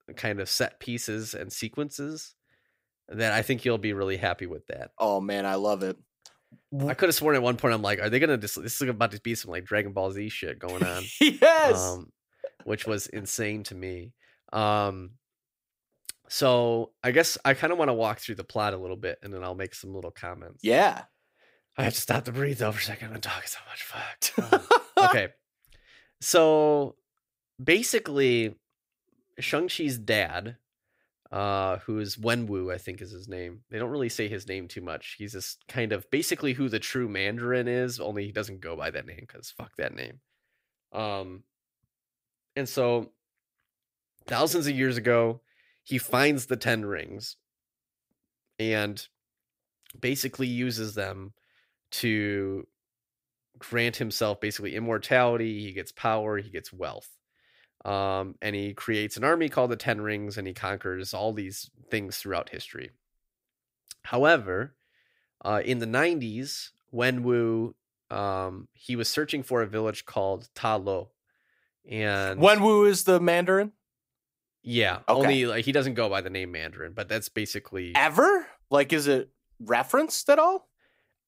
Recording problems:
none

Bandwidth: 15.5 kHz